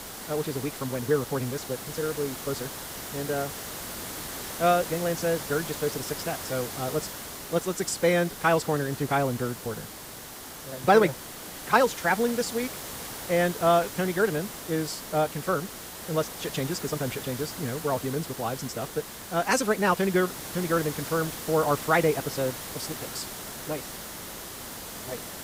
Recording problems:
wrong speed, natural pitch; too fast; 1.5 times normal speed
hiss; loud; throughout; 9 dB below the speech

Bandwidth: 15.5 kHz